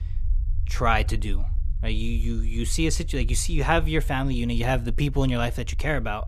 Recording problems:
low rumble; faint; throughout; 25 dB below the speech

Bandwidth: 14 kHz